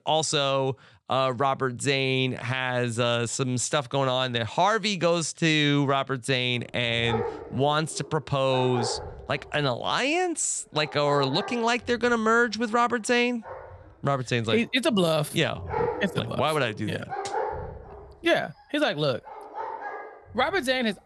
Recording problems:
animal sounds; noticeable; from 6.5 s on; 10 dB below the speech

